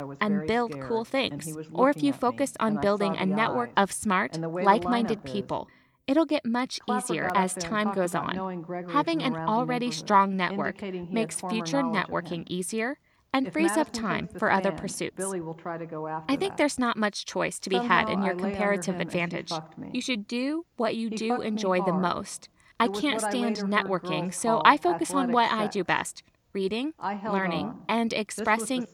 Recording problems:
voice in the background; loud; throughout; 8 dB below the speech

